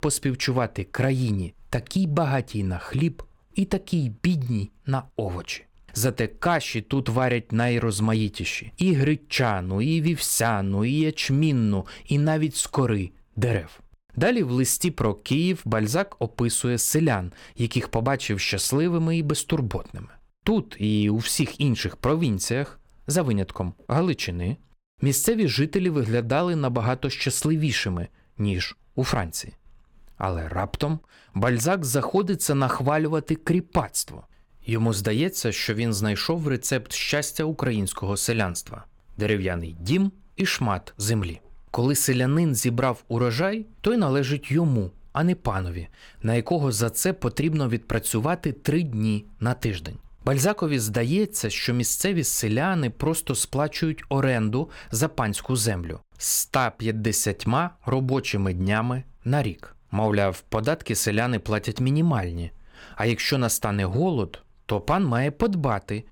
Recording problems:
none

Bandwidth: 17 kHz